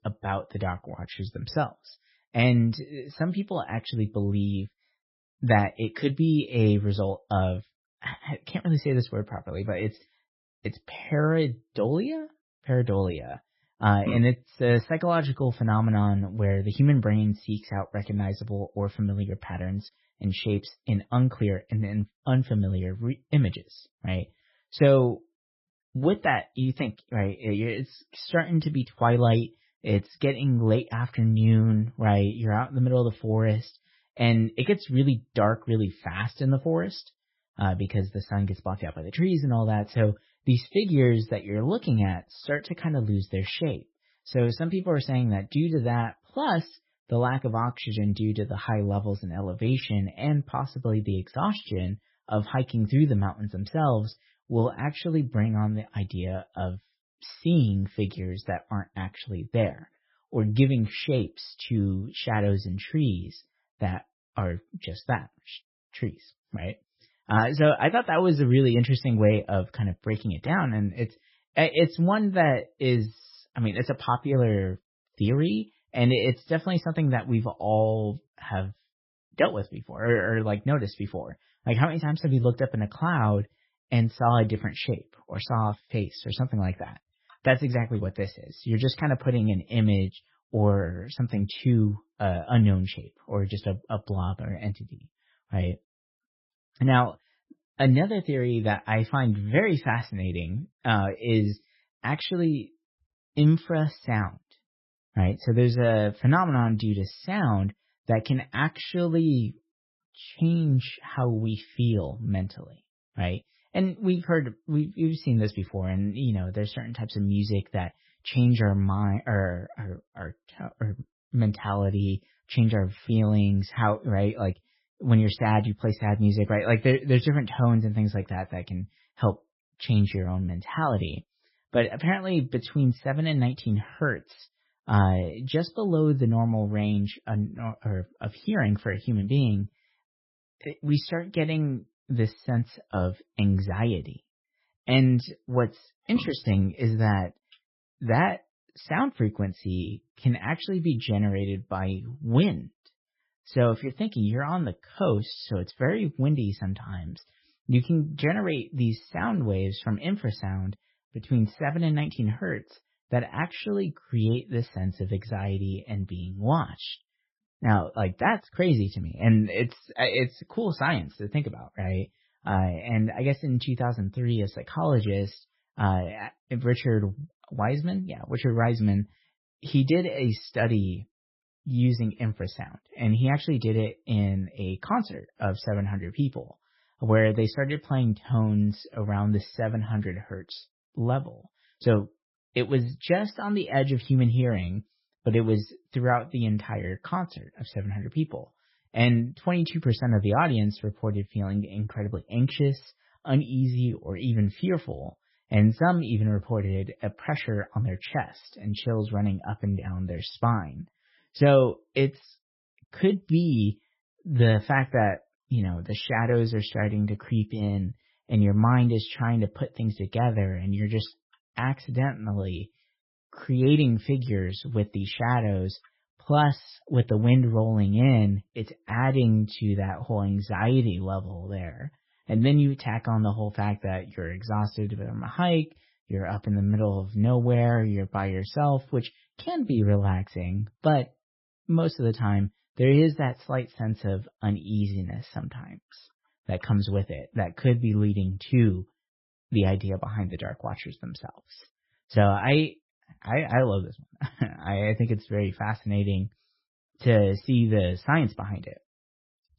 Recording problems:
garbled, watery; badly; nothing above 5.5 kHz

